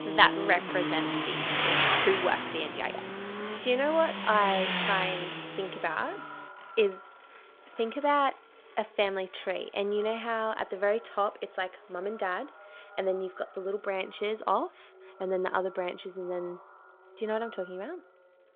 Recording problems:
echo of what is said; faint; throughout; 560 ms later, 20 dB below the speech
phone-call audio
traffic noise; loud; throughout; as loud as the speech

